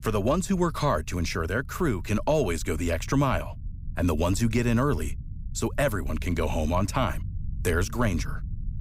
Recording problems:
low rumble; faint; throughout; 25 dB below the speech

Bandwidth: 15.5 kHz